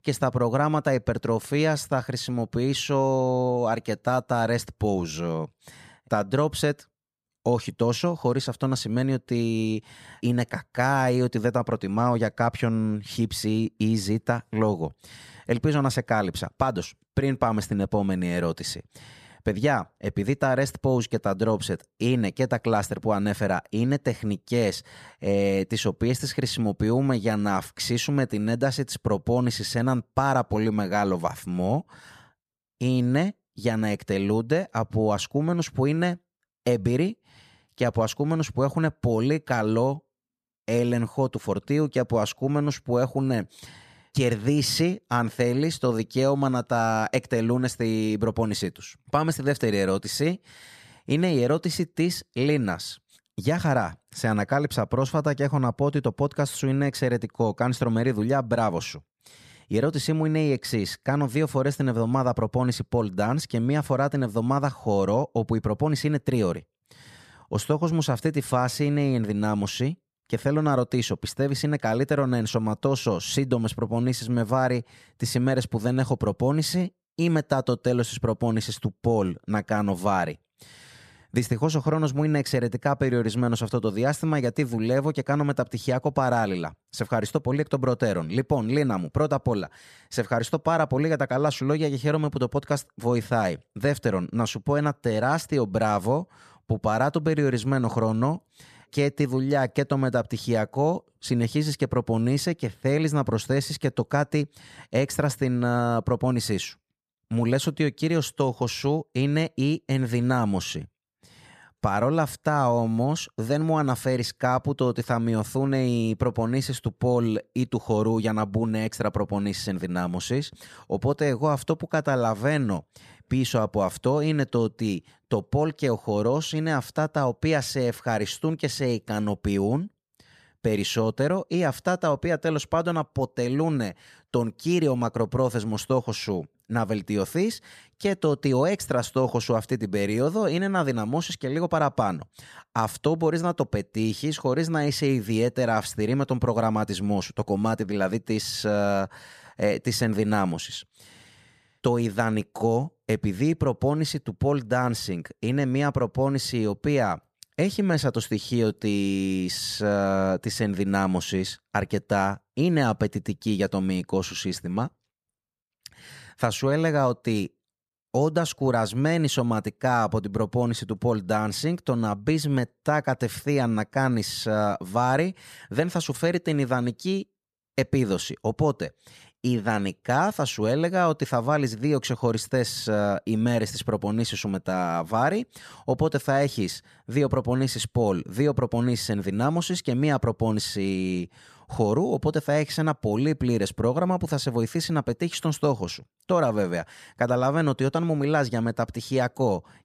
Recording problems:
none

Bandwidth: 14.5 kHz